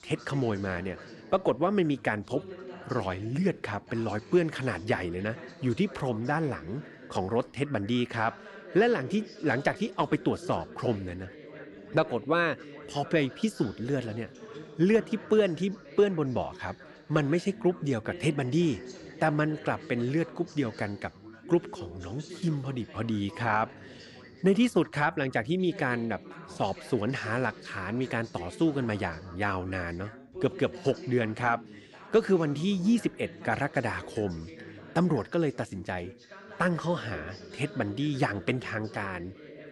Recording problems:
background chatter; noticeable; throughout; 3 voices, 15 dB below the speech

